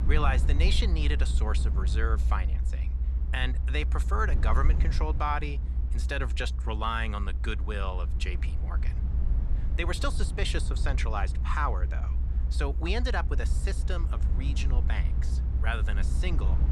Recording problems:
low rumble; noticeable; throughout; 15 dB below the speech

